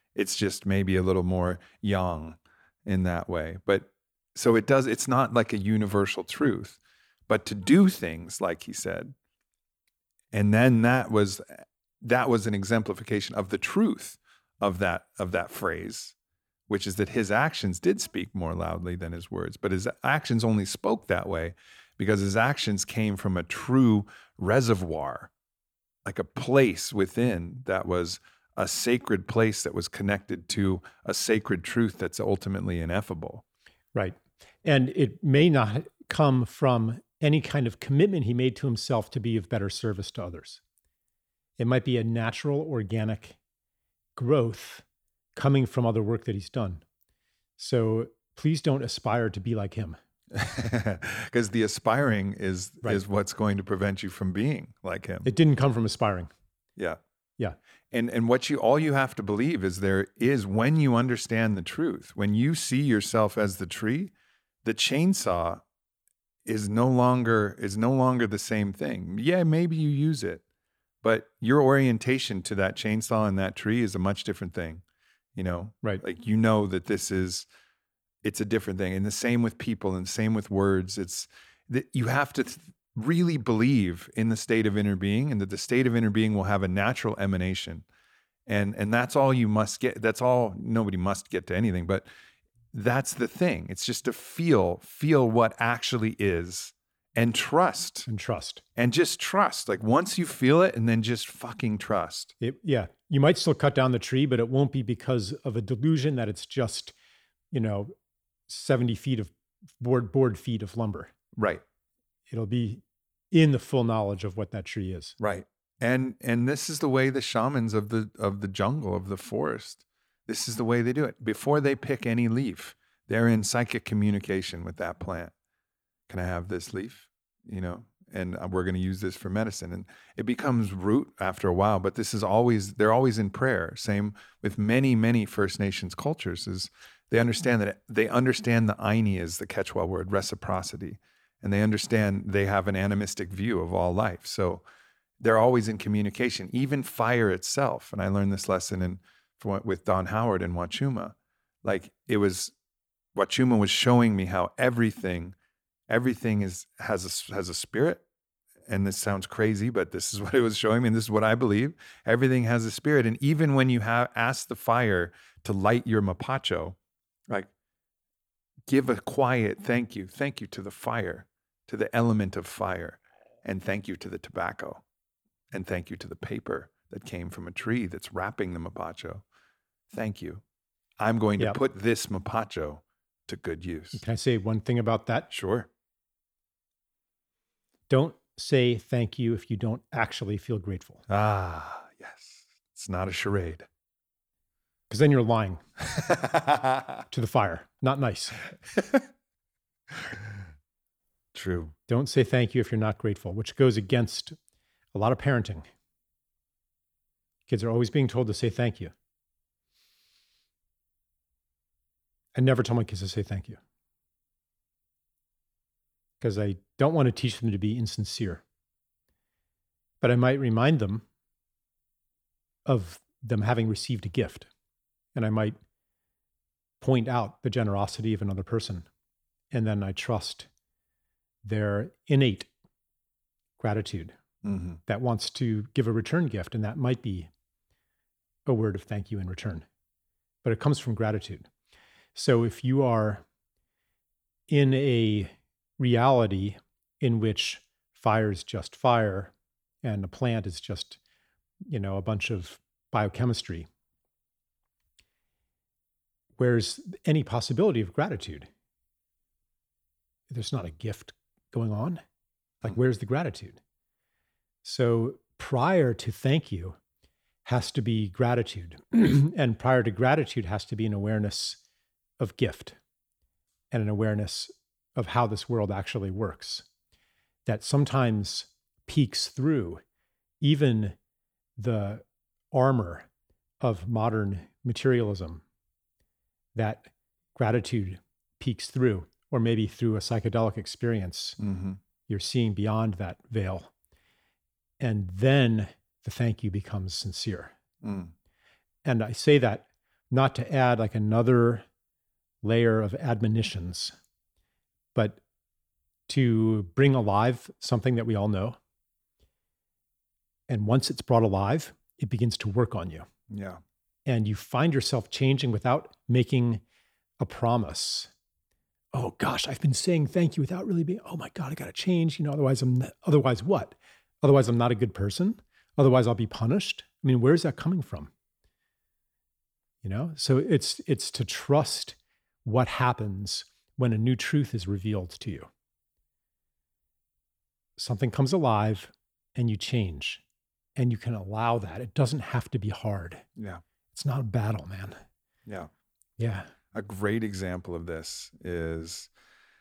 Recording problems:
none

